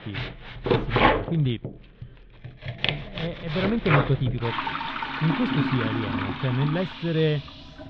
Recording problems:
muffled; very; fading above 3.5 kHz
household noises; loud; throughout; as loud as the speech

